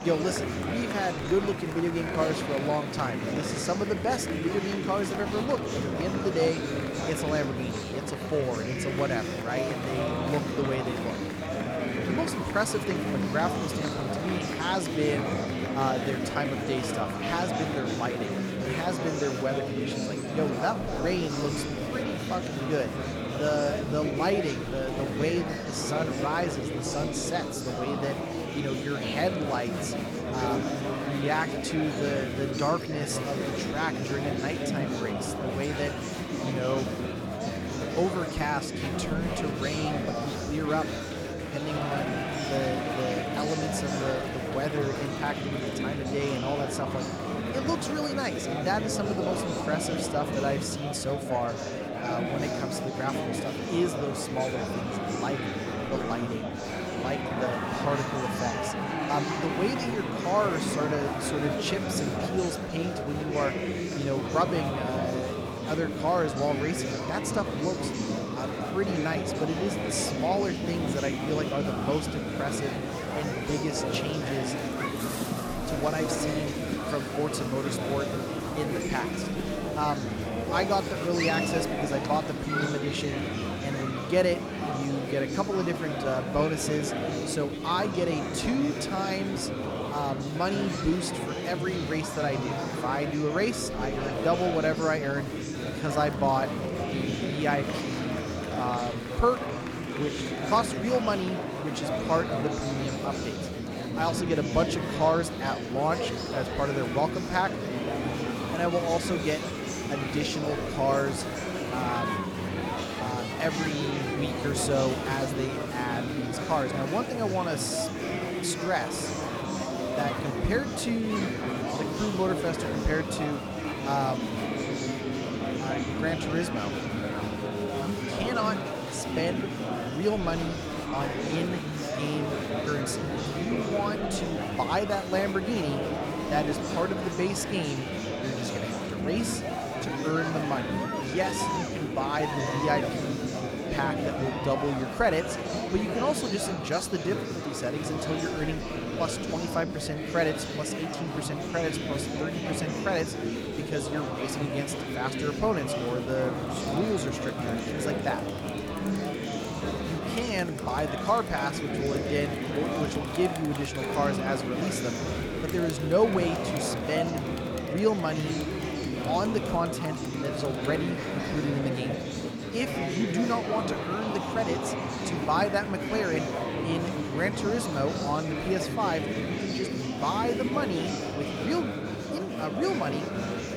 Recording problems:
murmuring crowd; loud; throughout; as loud as the speech

